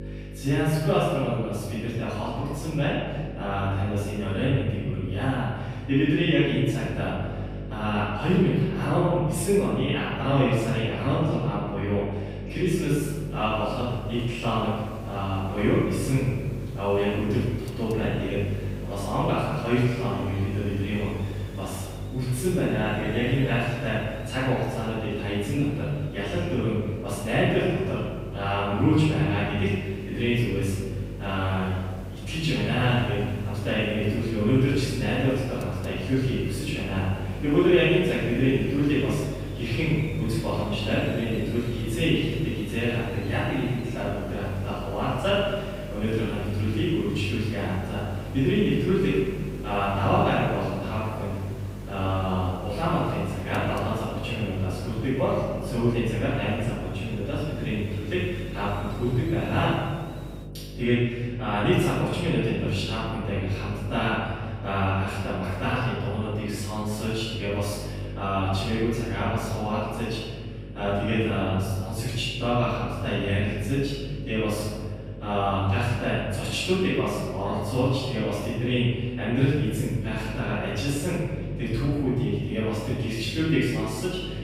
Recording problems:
room echo; strong; dies away in 1.5 s
off-mic speech; far
electrical hum; noticeable; throughout; 50 Hz, 15 dB below the speech
hiss; very faint; from 13 s to 1:00; 20 dB below the speech

